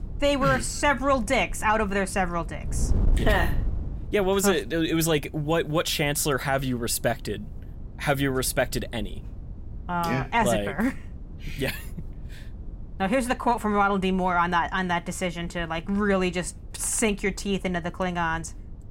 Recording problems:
wind noise on the microphone; occasional gusts; 25 dB below the speech

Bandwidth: 16 kHz